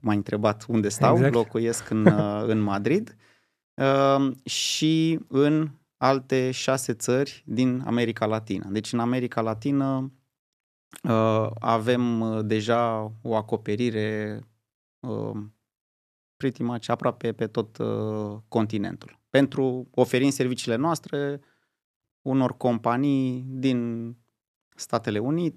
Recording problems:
none

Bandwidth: 14 kHz